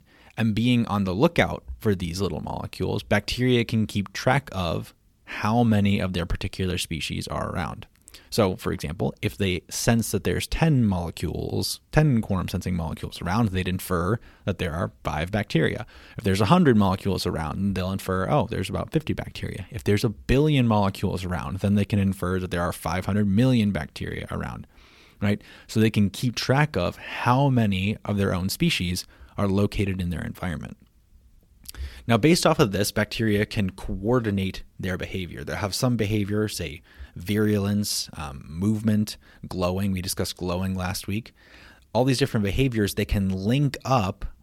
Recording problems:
none

